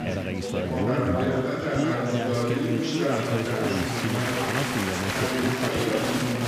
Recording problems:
chatter from many people; very loud; throughout; 4 dB above the speech

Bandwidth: 15 kHz